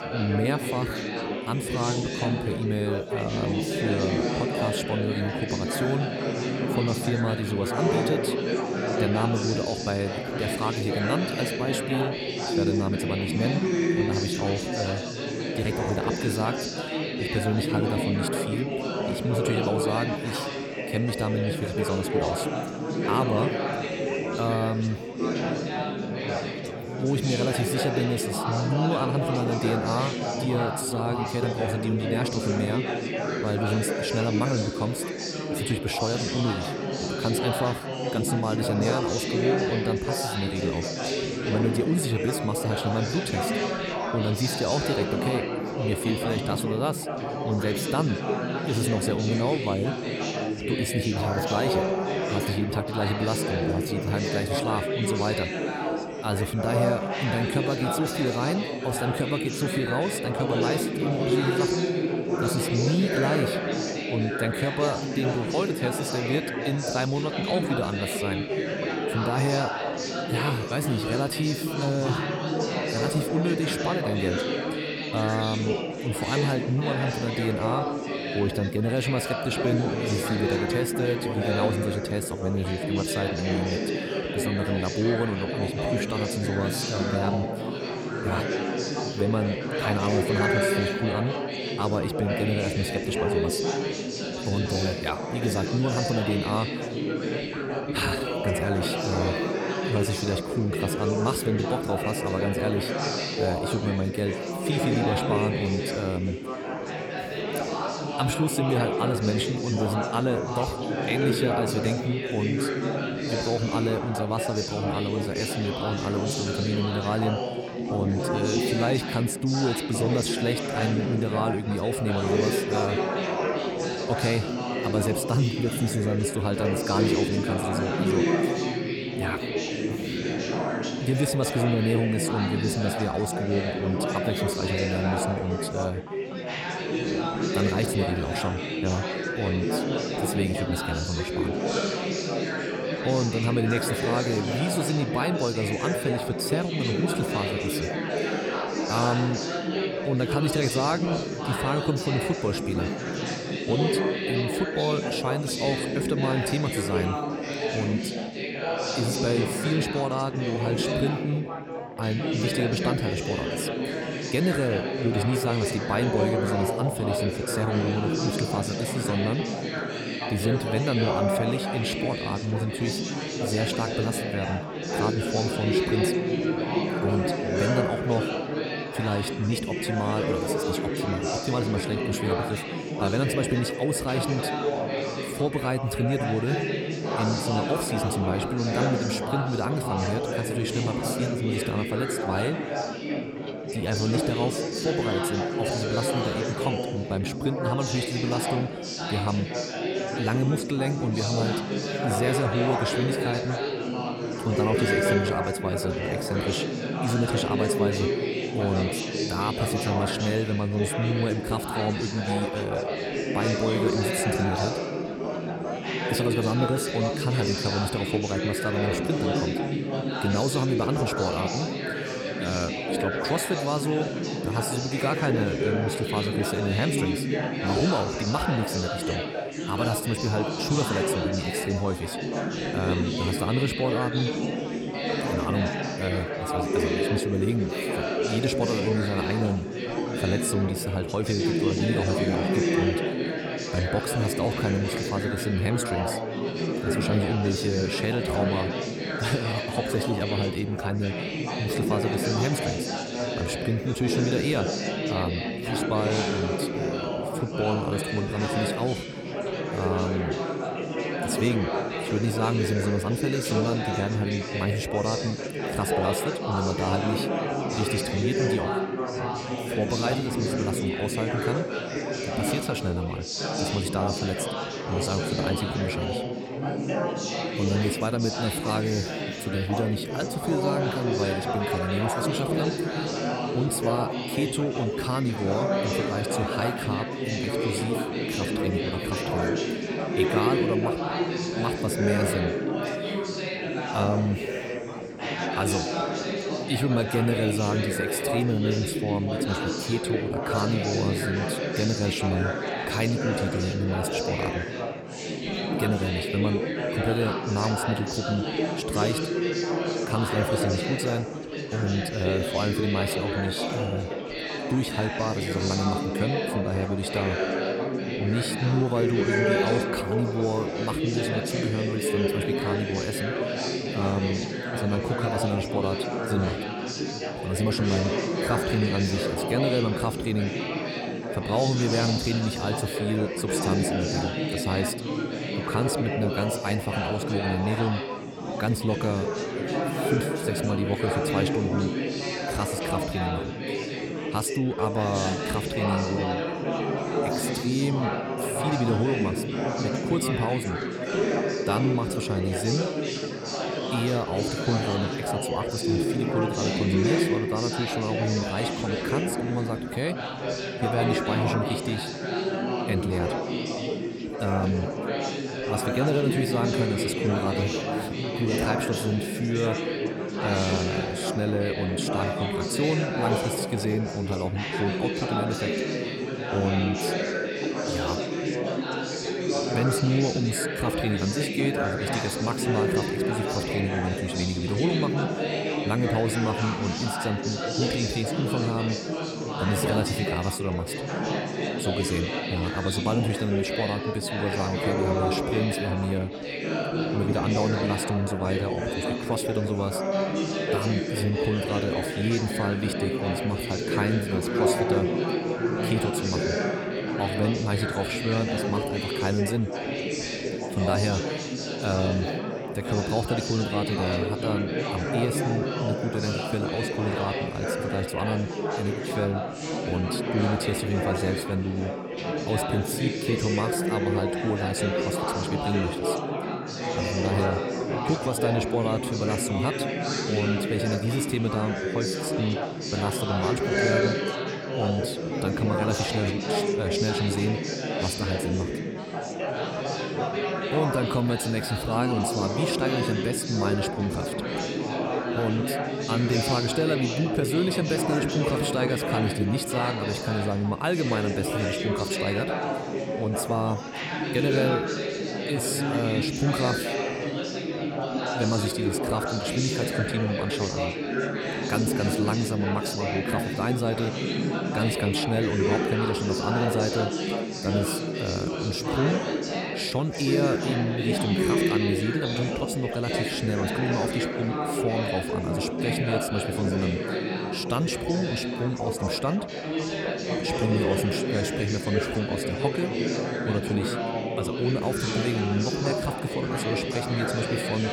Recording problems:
chatter from many people; very loud; throughout; as loud as the speech

